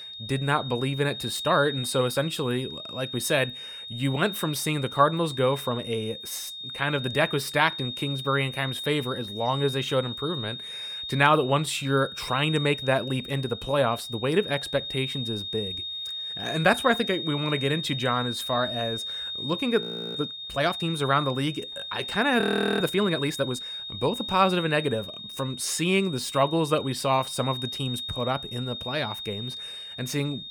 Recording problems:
high-pitched whine; loud; throughout; 3.5 kHz, 7 dB below the speech
audio freezing; at 20 s and at 22 s

